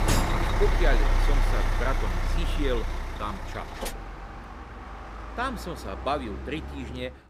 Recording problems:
traffic noise; very loud; throughout; 2 dB above the speech

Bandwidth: 15.5 kHz